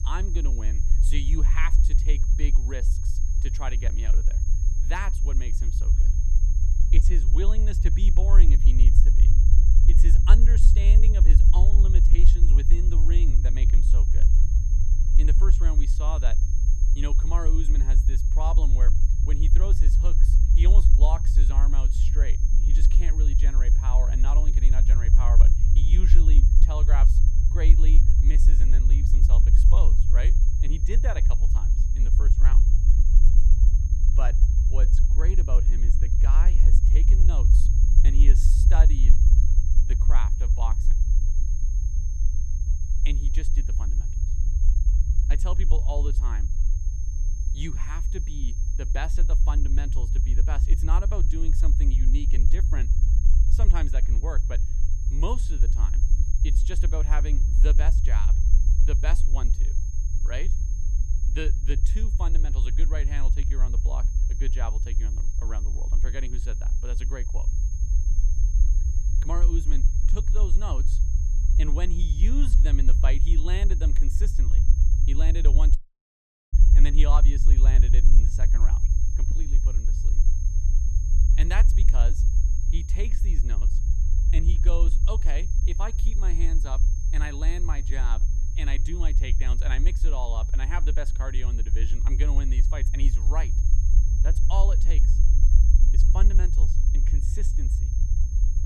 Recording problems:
high-pitched whine; loud; throughout; 6.5 kHz, 9 dB below the speech
low rumble; loud; throughout; 6 dB below the speech
audio cutting out; at 1:16 for 1 s

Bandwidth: 14.5 kHz